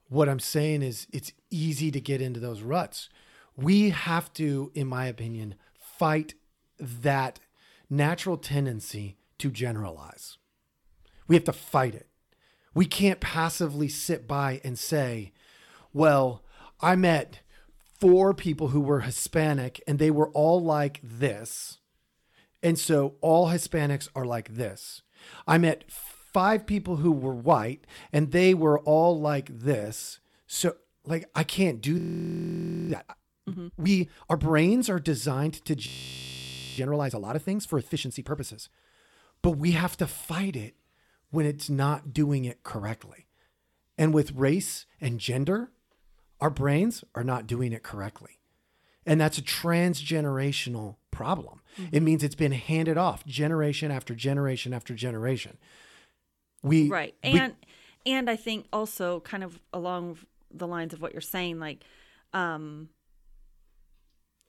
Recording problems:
audio freezing; at 32 s for 1 s and at 36 s for 1 s

